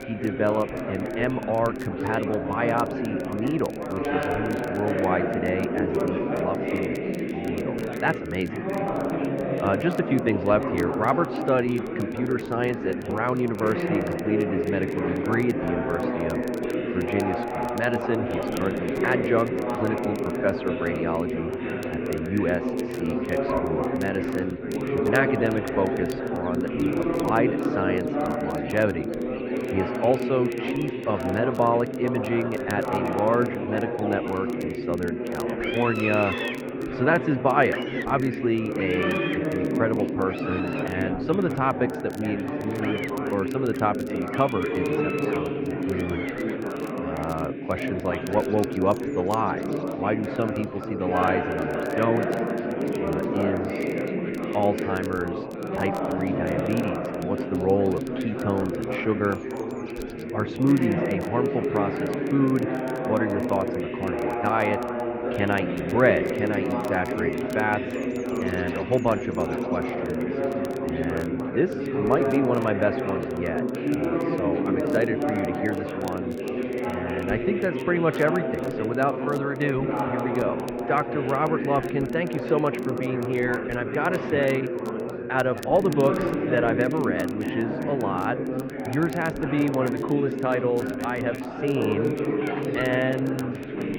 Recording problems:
muffled; very; fading above 2.5 kHz
chatter from many people; loud; throughout; 1 dB below the speech
animal sounds; noticeable; throughout; 10 dB below the speech
crackle, like an old record; faint; 25 dB below the speech

